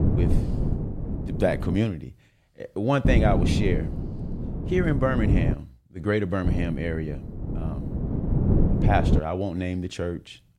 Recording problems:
wind noise on the microphone; heavy; until 2 s, from 3 to 5.5 s and from 6.5 to 9 s; 7 dB below the speech

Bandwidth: 17.5 kHz